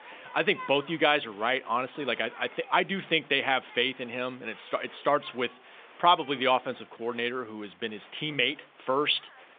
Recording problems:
phone-call audio; nothing above 3.5 kHz
crowd noise; faint; throughout; 20 dB below the speech

